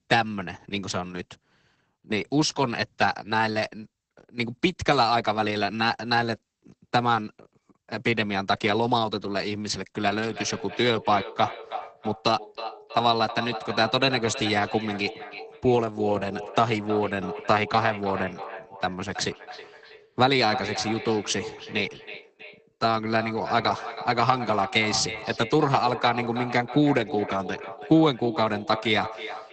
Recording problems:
echo of what is said; strong; from 10 s on; 320 ms later, 10 dB below the speech
garbled, watery; badly; nothing above 8 kHz

